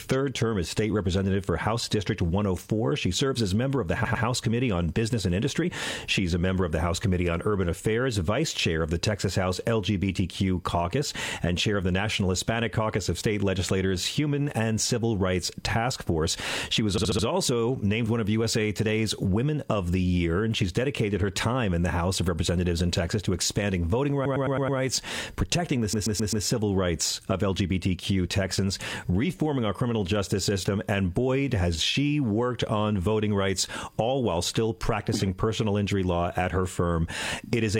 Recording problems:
squashed, flat; heavily
audio stuttering; 4 times, first at 4 s
abrupt cut into speech; at the end

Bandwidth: 16 kHz